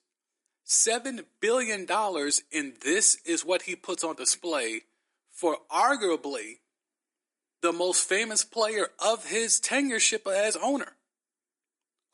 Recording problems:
thin; somewhat; fading below 300 Hz
garbled, watery; slightly; nothing above 10.5 kHz

